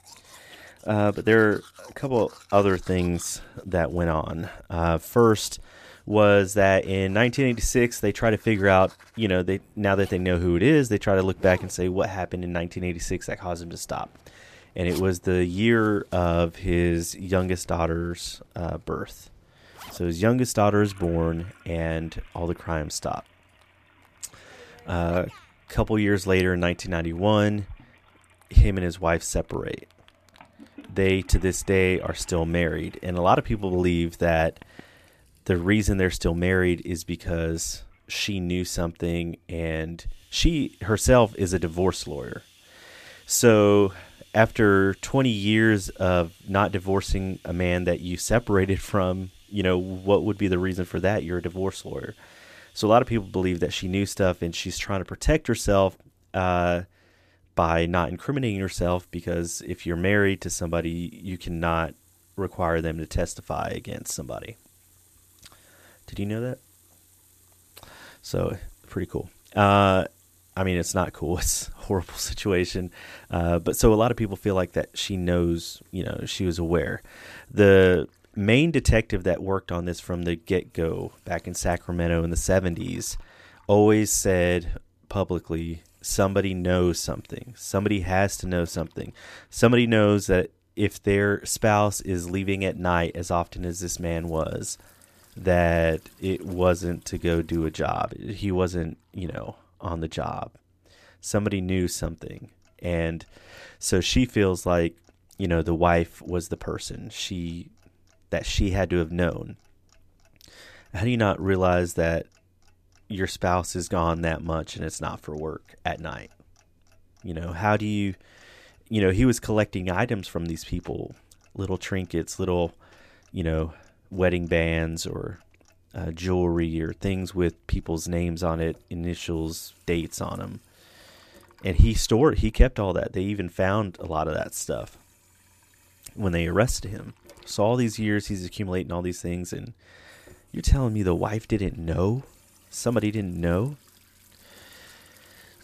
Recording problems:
household noises; faint; throughout; 30 dB below the speech

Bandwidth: 14.5 kHz